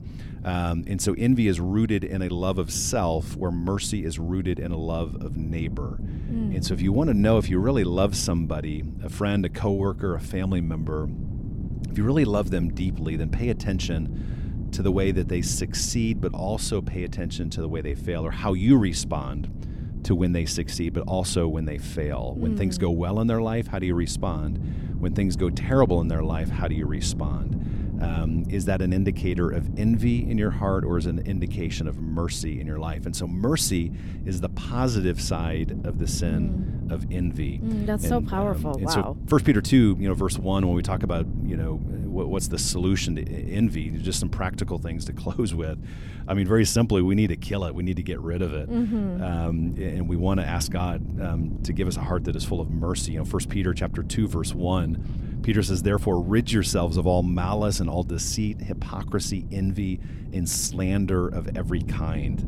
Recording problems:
wind noise on the microphone; occasional gusts; 15 dB below the speech

